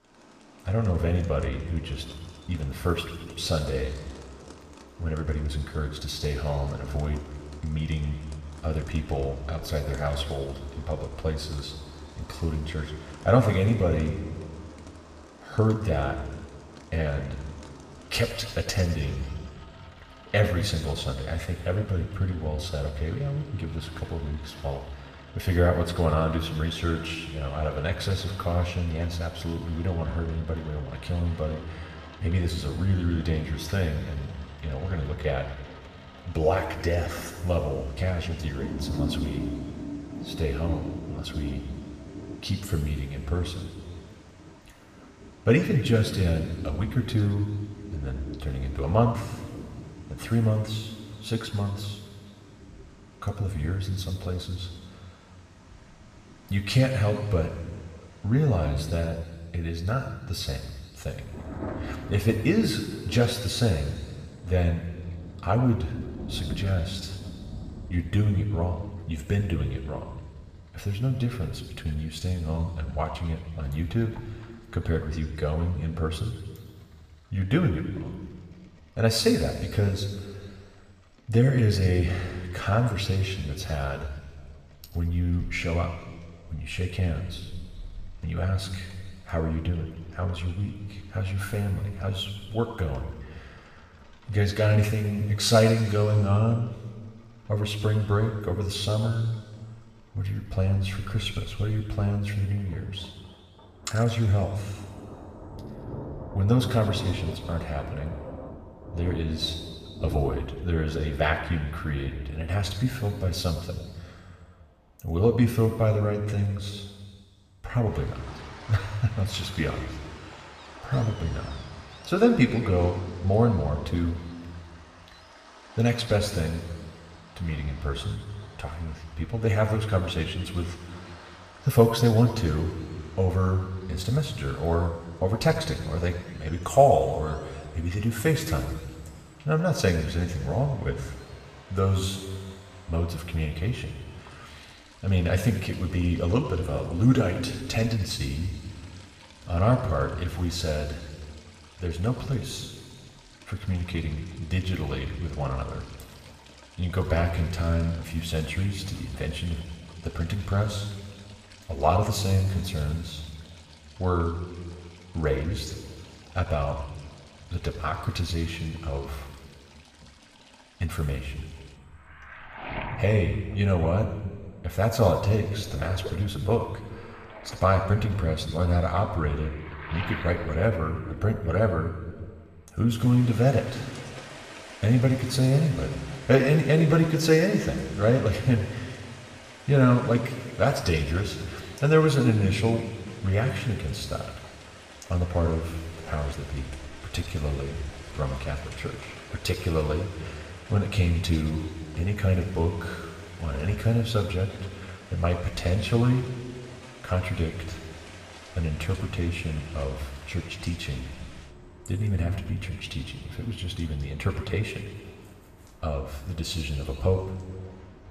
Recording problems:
room echo; noticeable; dies away in 1.7 s
off-mic speech; somewhat distant
rain or running water; noticeable; throughout; 20 dB below the speech

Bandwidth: 14.5 kHz